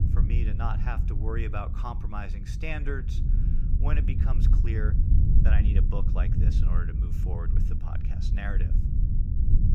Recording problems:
low rumble; loud; throughout; 4 dB below the speech

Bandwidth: 15.5 kHz